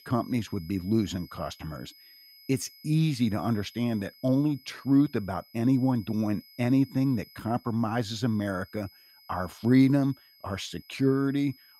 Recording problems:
high-pitched whine; faint; throughout; 5 kHz, 25 dB below the speech

